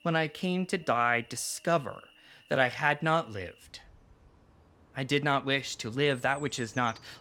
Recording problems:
animal sounds; faint; throughout; 25 dB below the speech

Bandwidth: 17 kHz